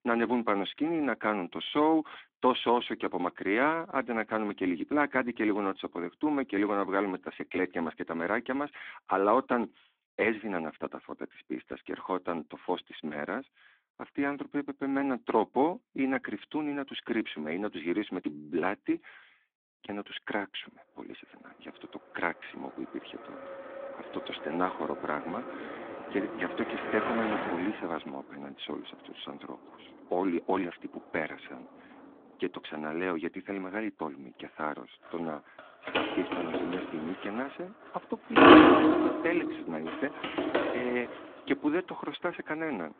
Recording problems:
phone-call audio; nothing above 3.5 kHz
traffic noise; very loud; from 21 s on; 8 dB above the speech

